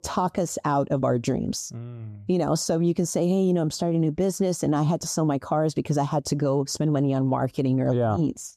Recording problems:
none

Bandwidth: 14.5 kHz